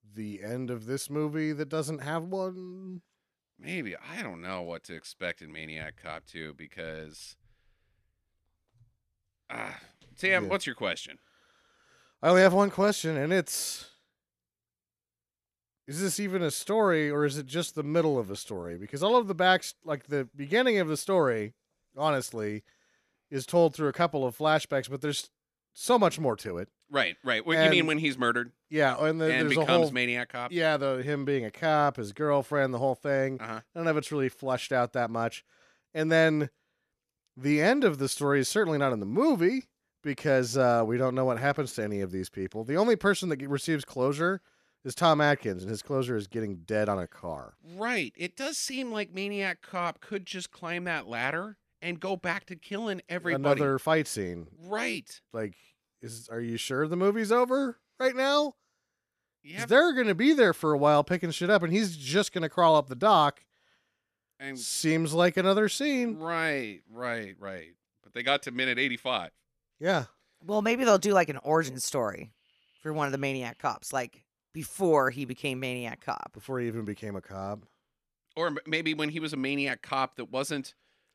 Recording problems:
none

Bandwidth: 14 kHz